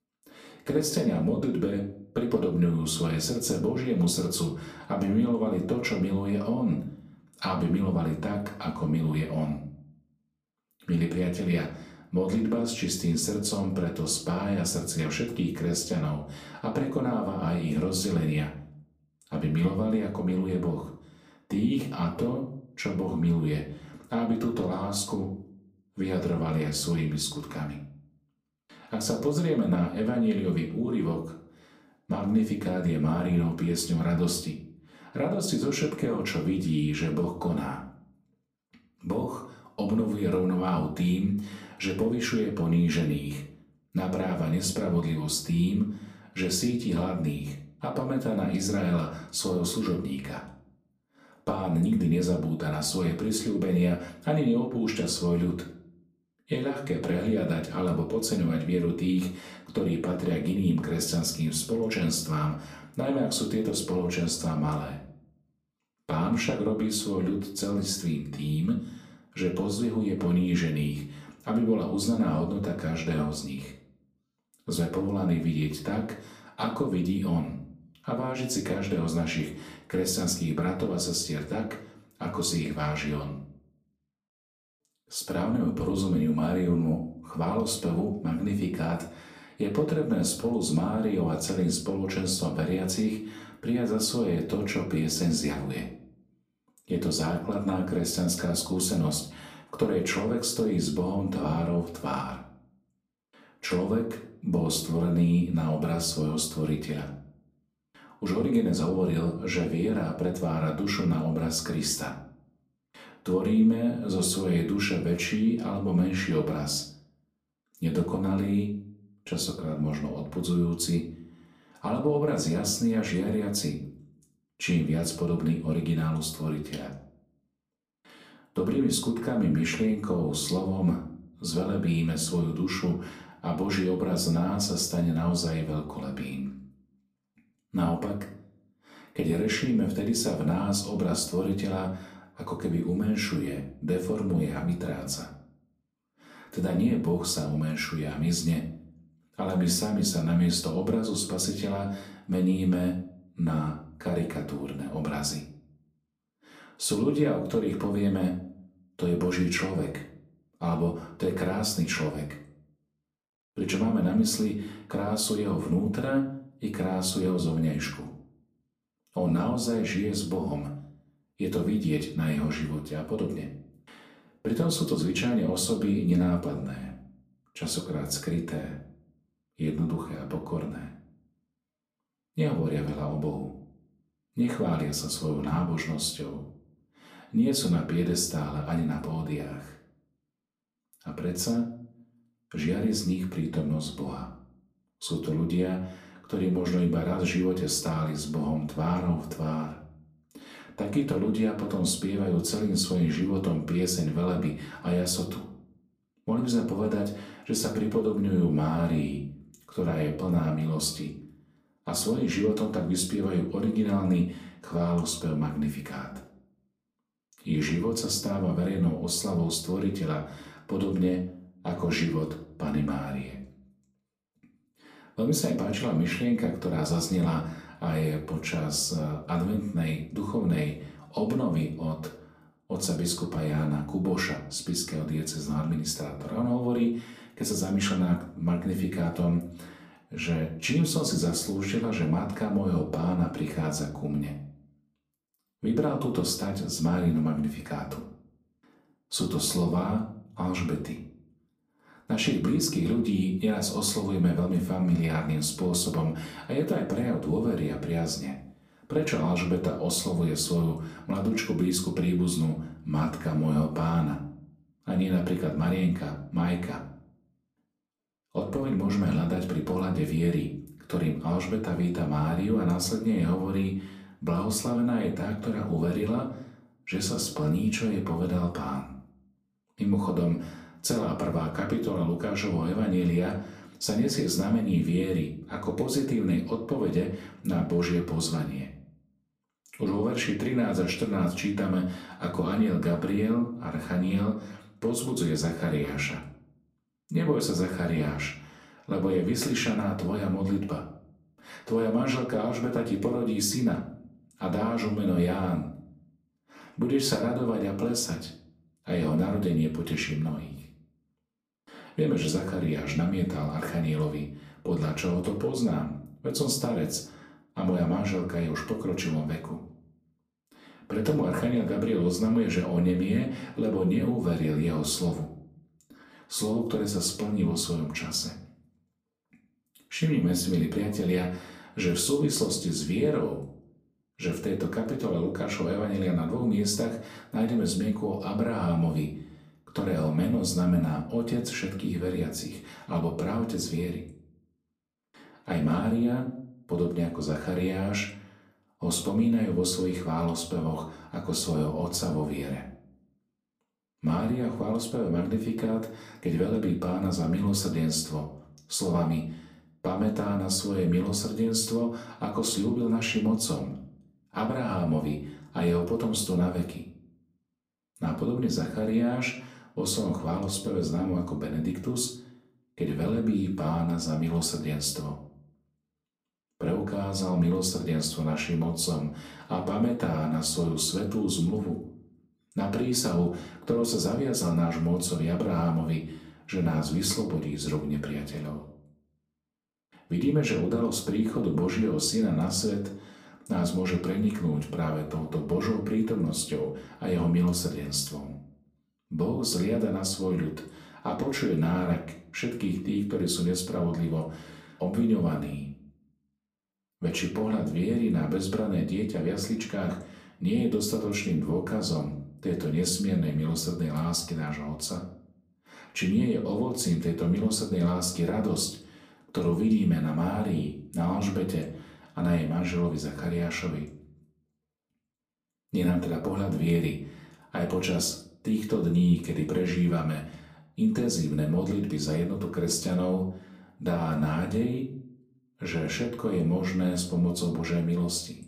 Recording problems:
off-mic speech; far
room echo; slight; dies away in 0.5 s

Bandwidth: 15 kHz